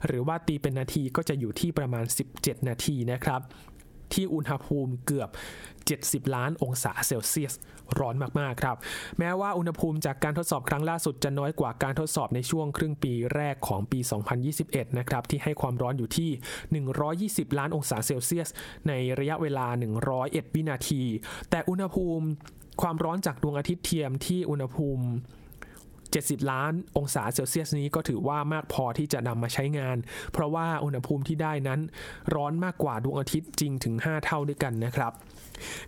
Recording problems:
squashed, flat; heavily

